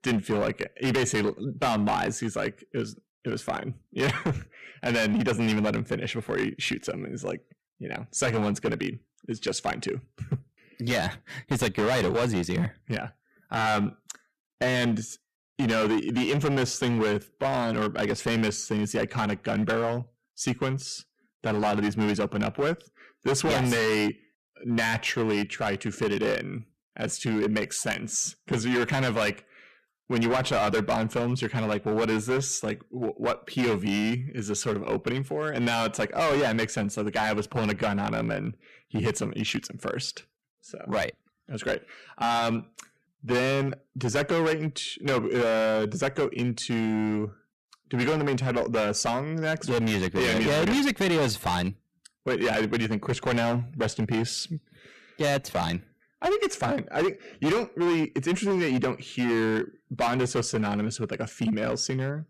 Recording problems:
distortion; heavy; 12% of the sound clipped

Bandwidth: 14.5 kHz